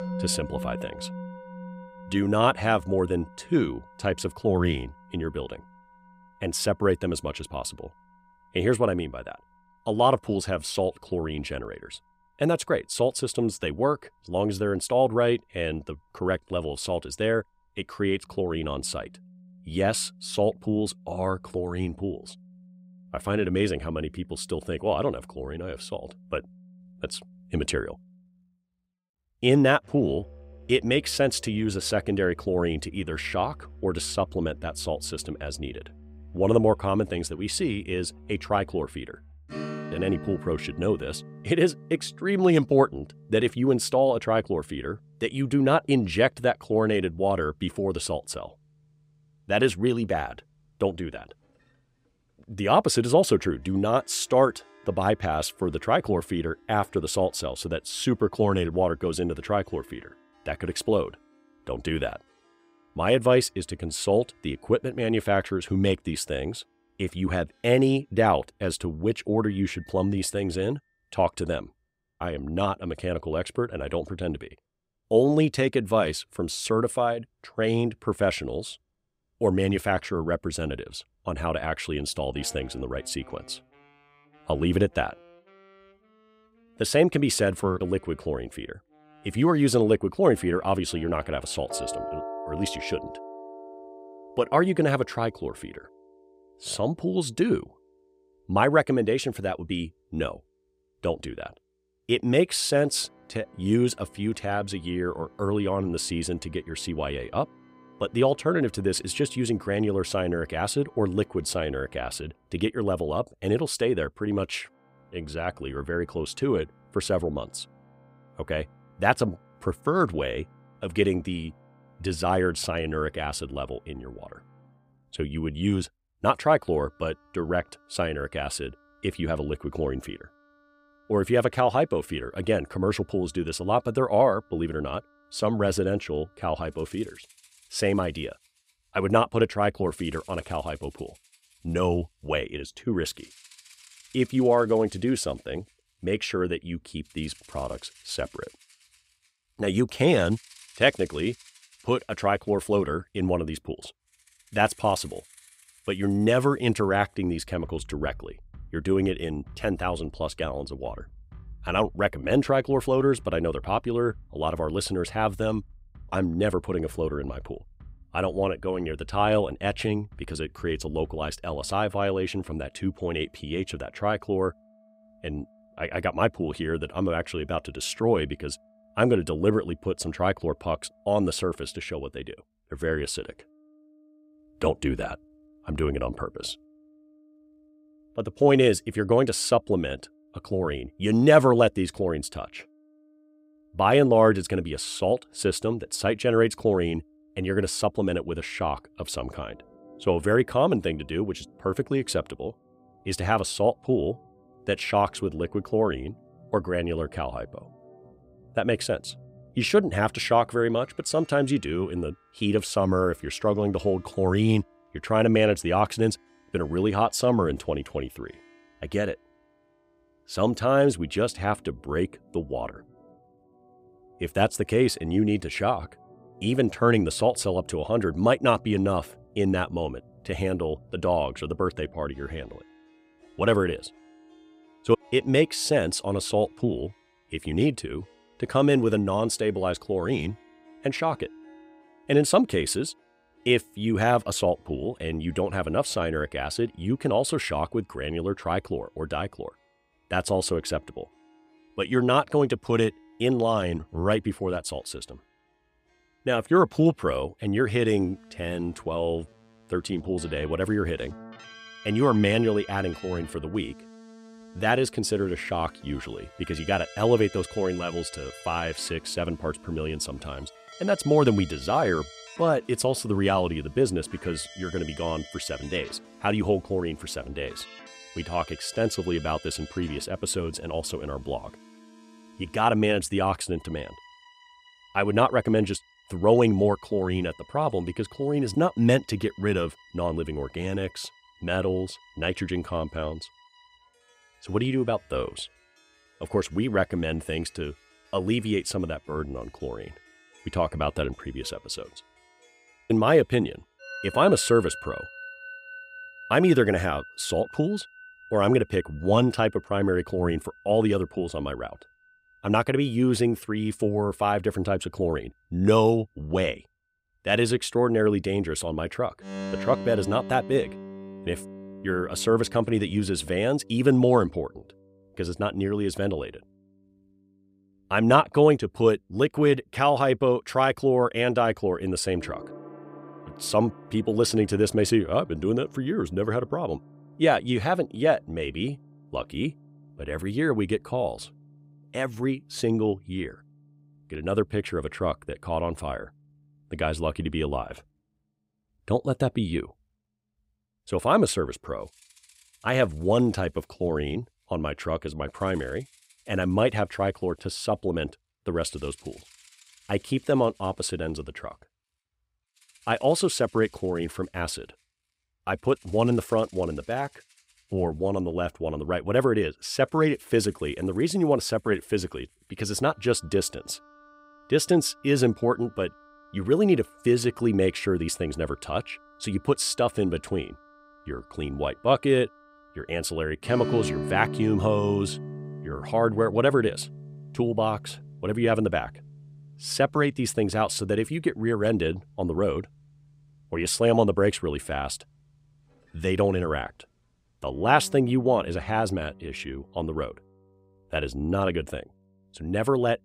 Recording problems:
background music; faint; throughout; 20 dB below the speech

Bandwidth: 15.5 kHz